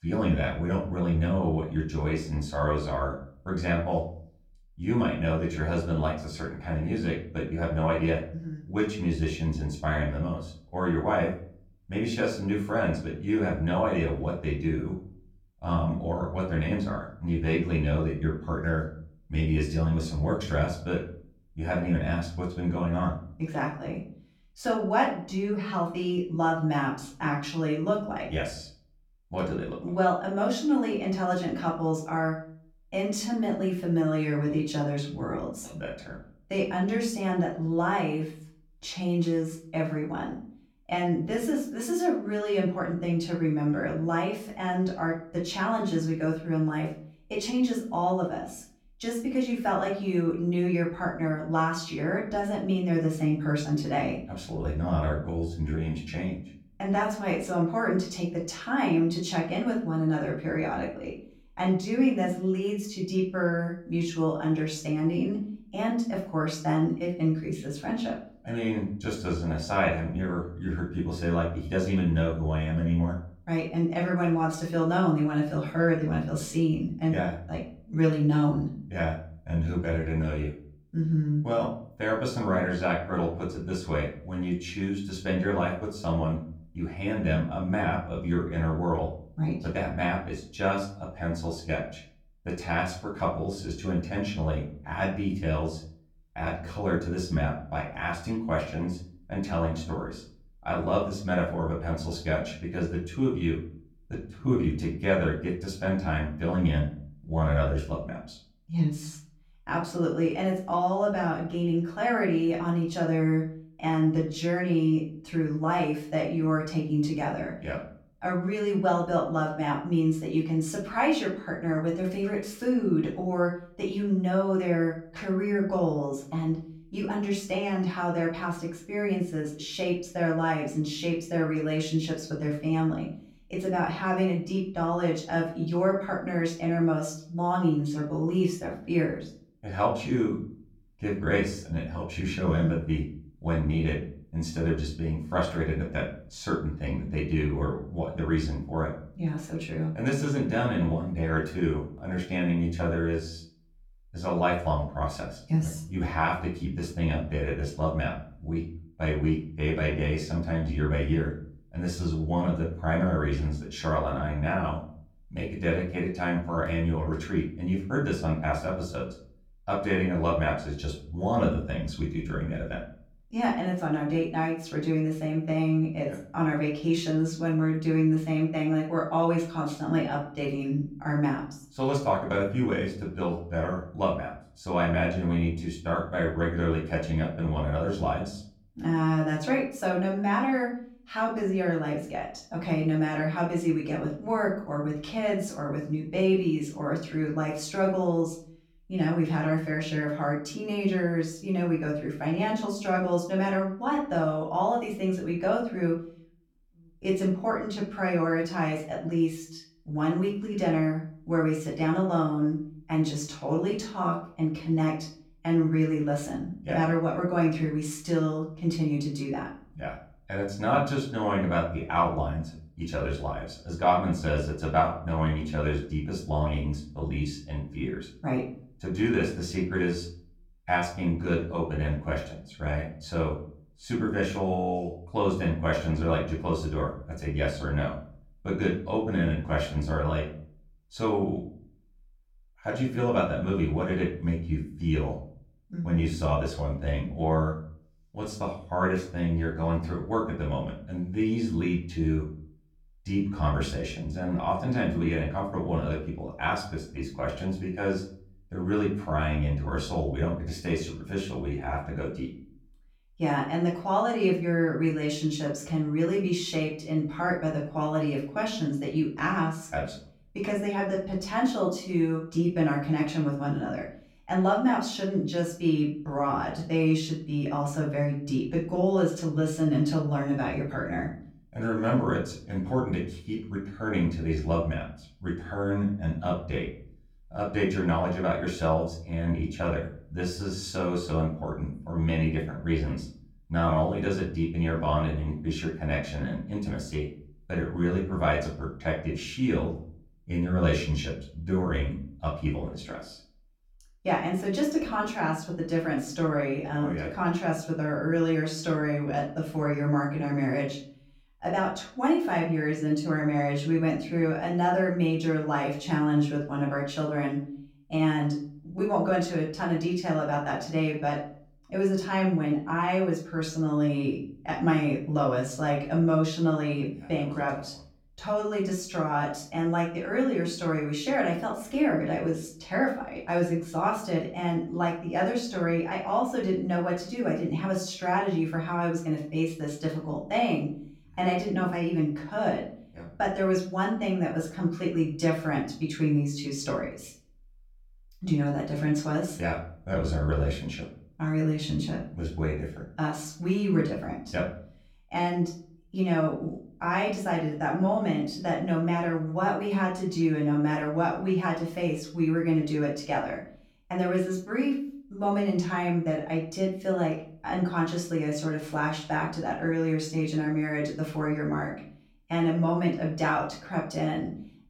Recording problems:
off-mic speech; far
room echo; slight; dies away in 0.4 s

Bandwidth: 17.5 kHz